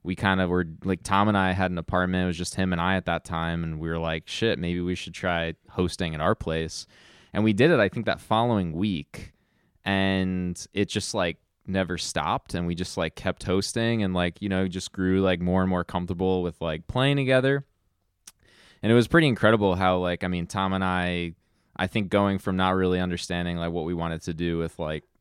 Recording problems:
none

